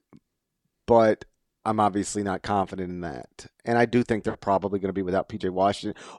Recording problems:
none

